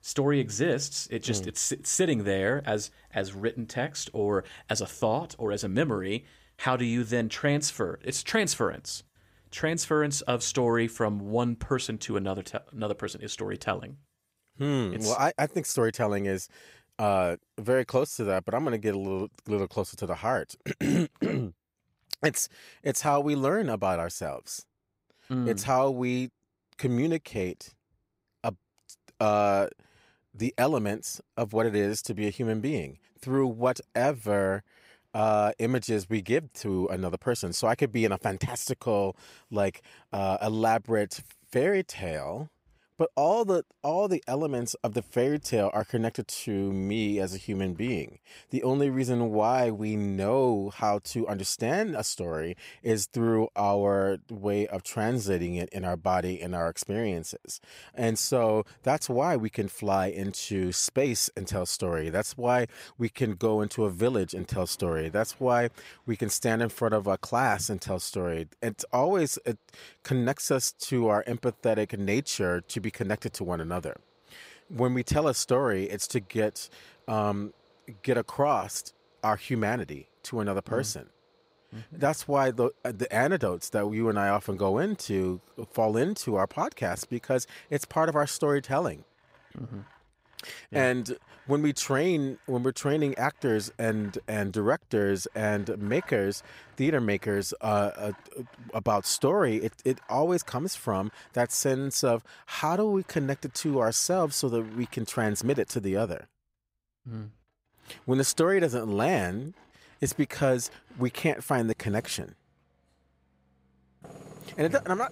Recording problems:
machinery noise; faint; throughout; 30 dB below the speech

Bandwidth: 15.5 kHz